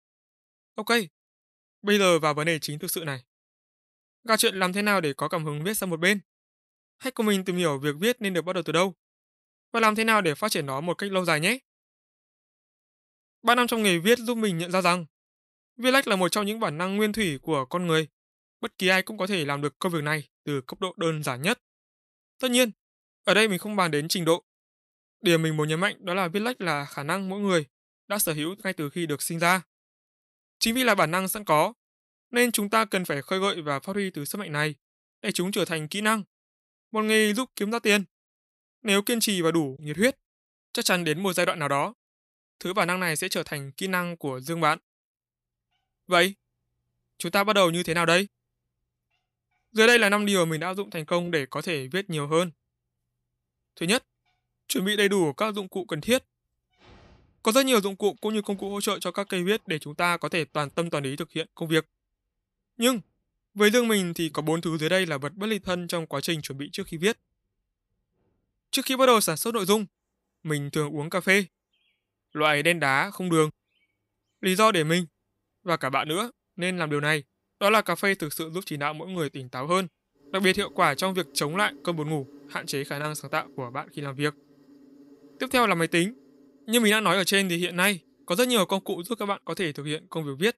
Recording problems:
animal sounds; faint; from 45 s on; 30 dB below the speech

